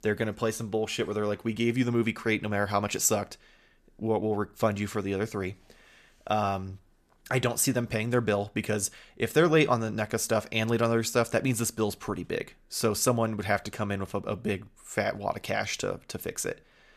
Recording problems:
none

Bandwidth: 14.5 kHz